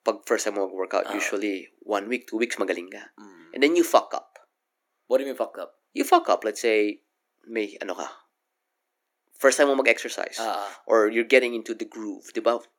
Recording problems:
thin; somewhat; fading below 300 Hz

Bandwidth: 18 kHz